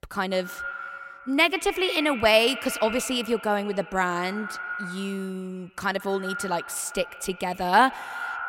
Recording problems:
echo of what is said; strong; throughout; 130 ms later, 10 dB below the speech

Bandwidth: 16 kHz